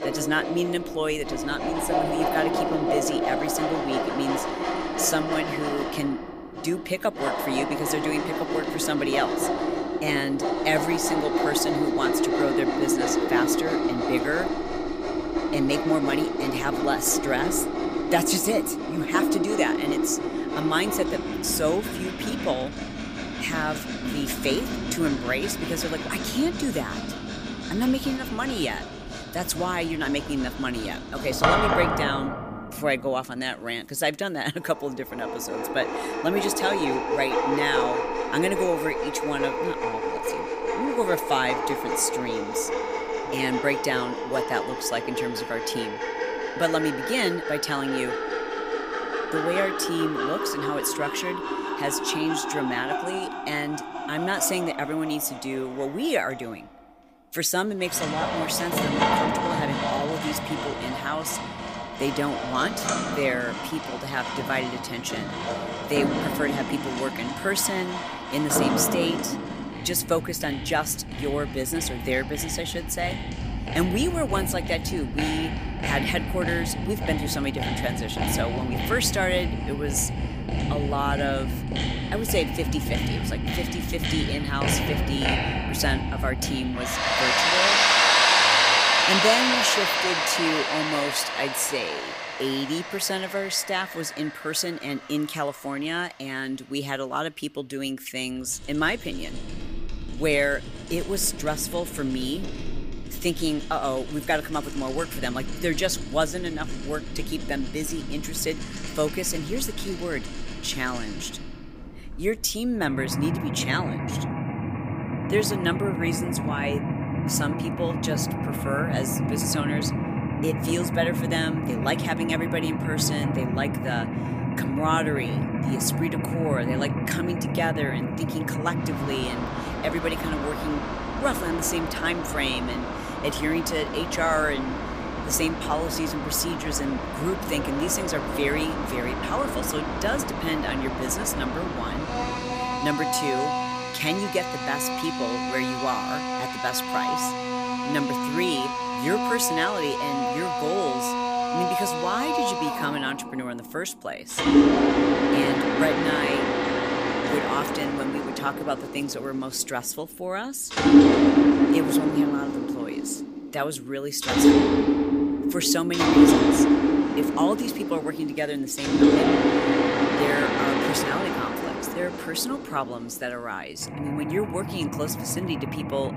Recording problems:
machinery noise; very loud; throughout; 2 dB above the speech

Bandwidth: 15 kHz